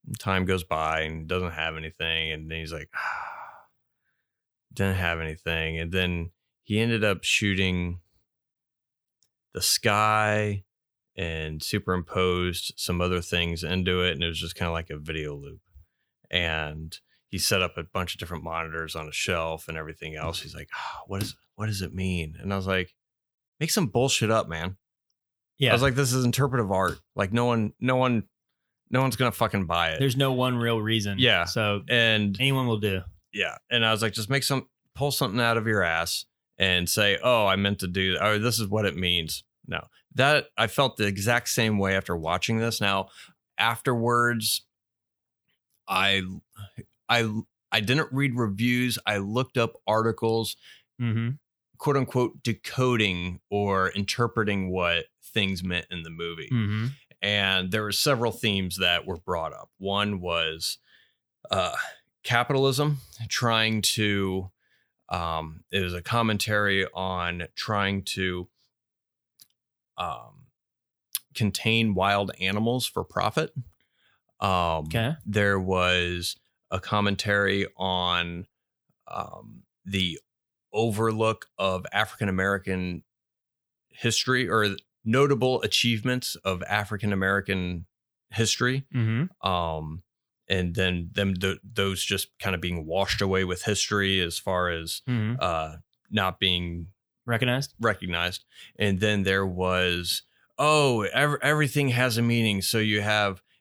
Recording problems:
none

